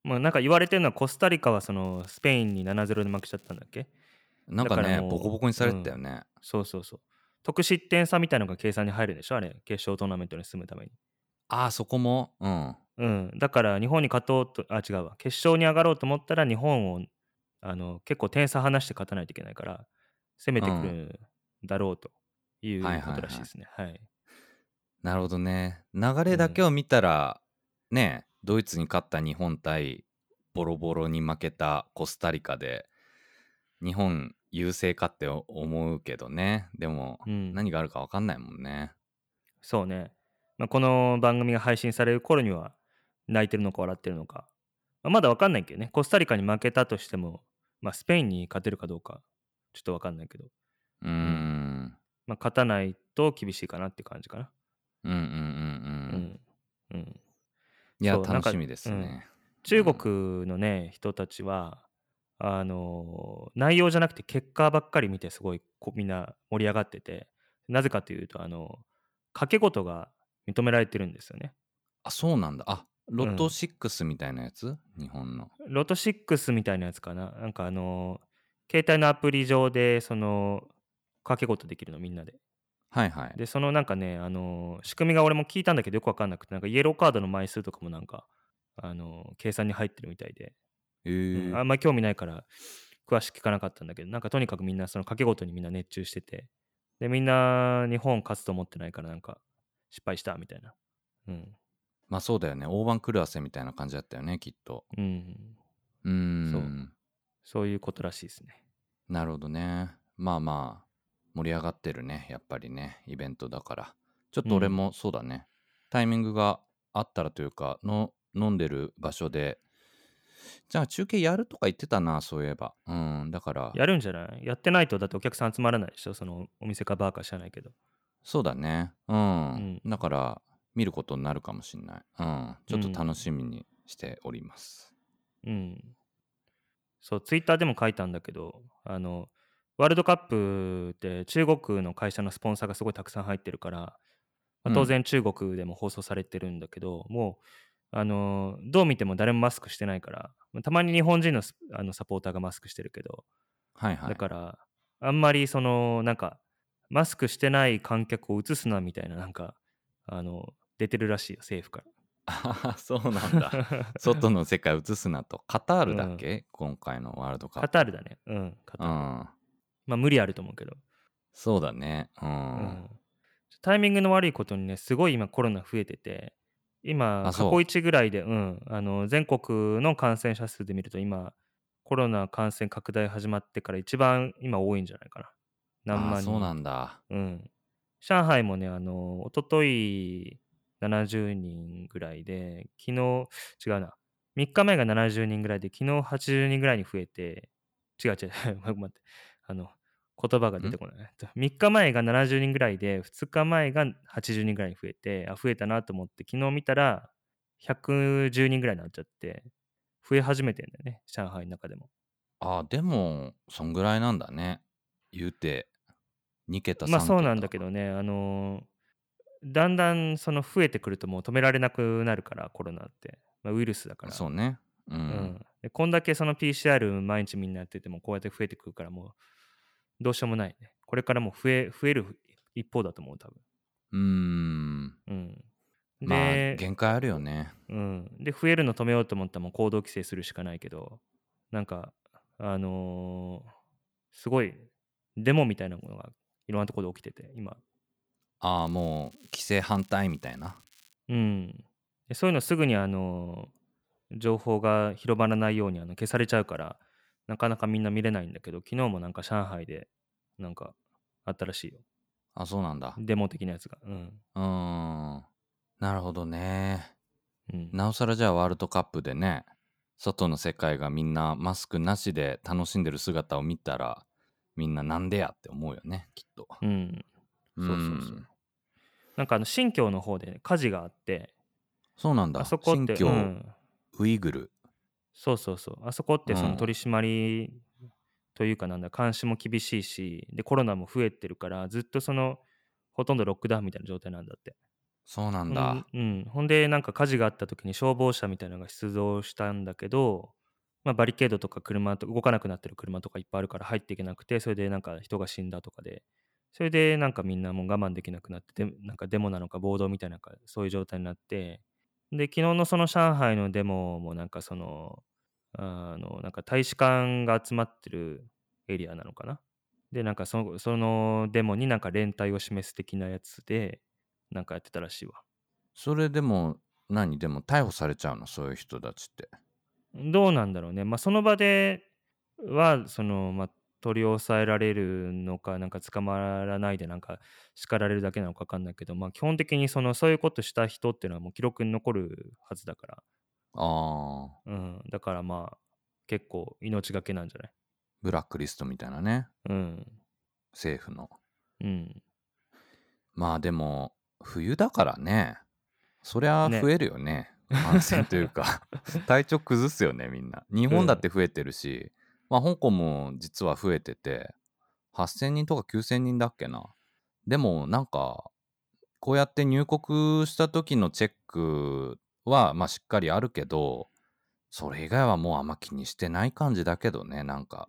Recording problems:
crackling; faint; from 2 to 3.5 s and from 4:09 to 4:11; 30 dB below the speech

